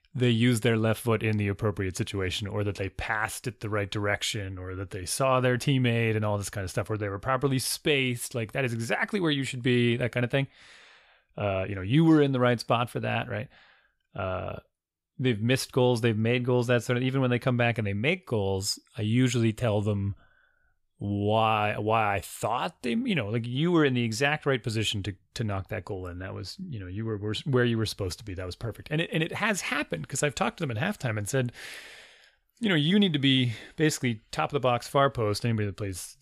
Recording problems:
none

